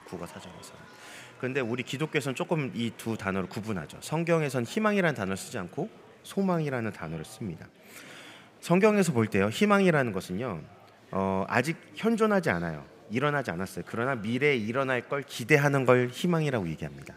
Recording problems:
murmuring crowd; faint; throughout; 25 dB below the speech

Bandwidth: 15.5 kHz